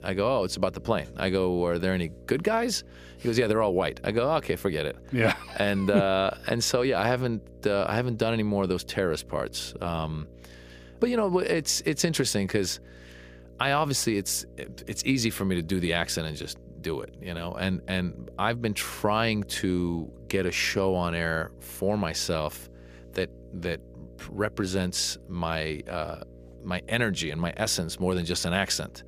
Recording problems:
electrical hum; faint; throughout; 60 Hz, 25 dB below the speech

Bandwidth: 15 kHz